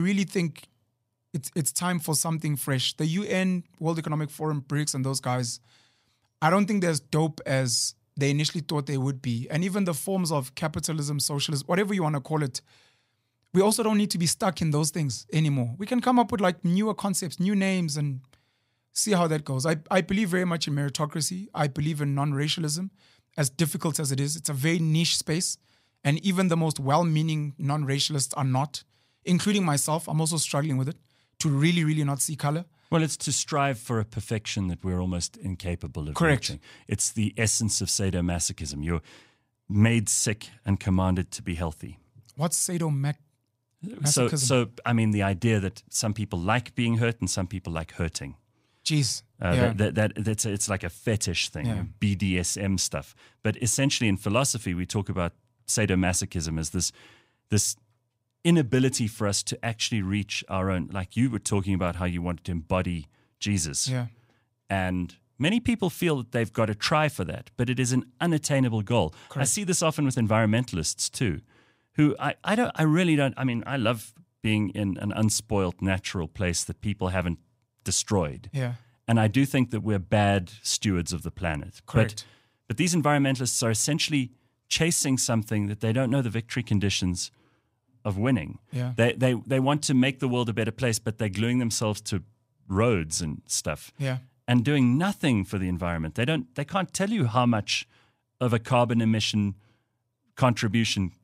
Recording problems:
abrupt cut into speech; at the start

